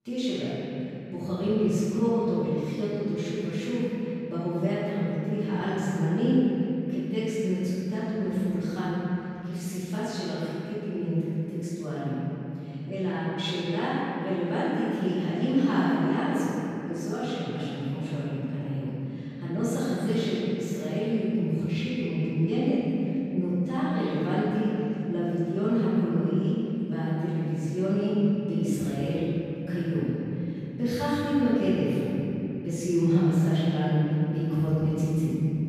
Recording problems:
room echo; strong; dies away in 3 s
off-mic speech; far

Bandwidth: 14 kHz